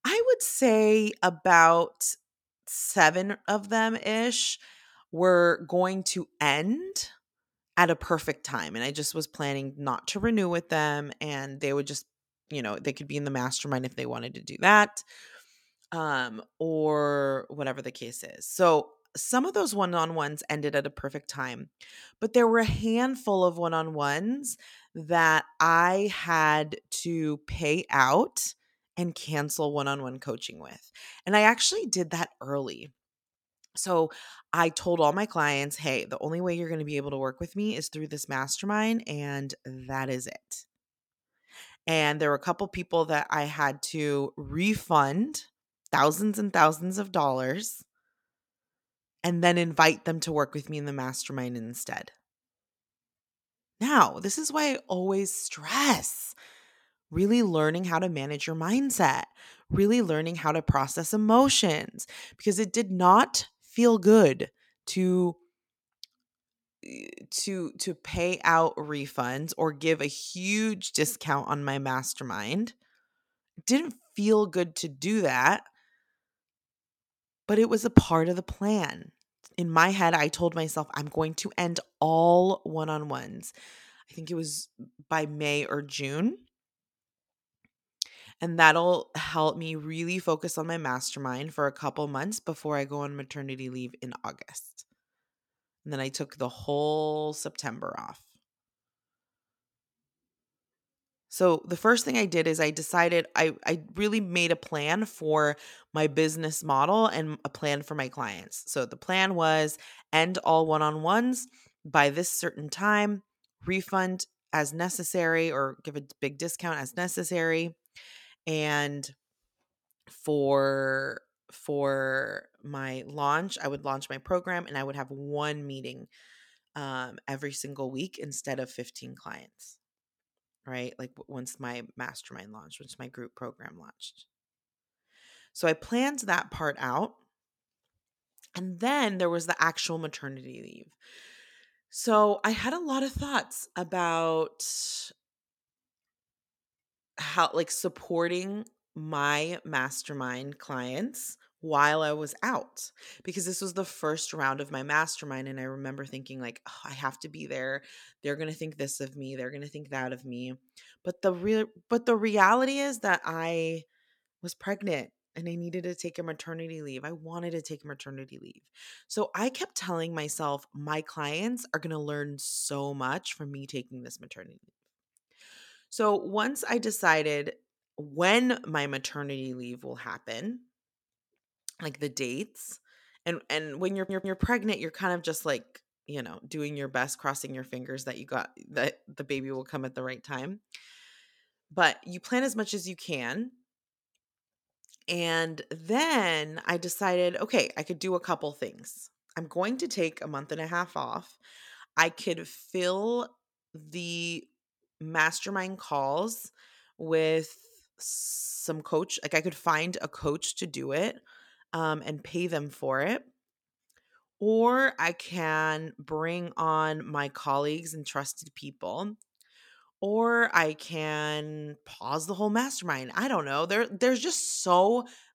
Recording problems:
audio stuttering; at 3:04

